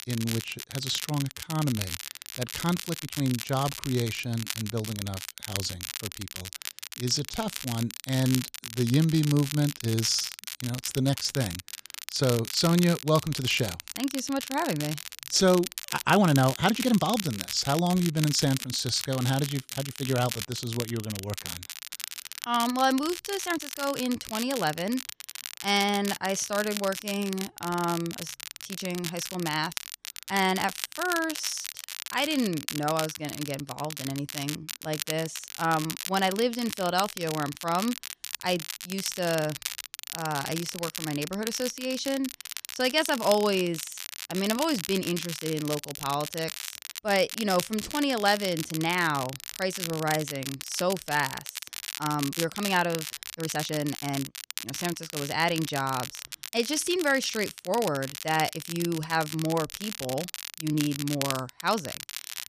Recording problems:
crackle, like an old record; loud; 7 dB below the speech
uneven, jittery; strongly; from 1.5 to 54 s

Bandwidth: 14.5 kHz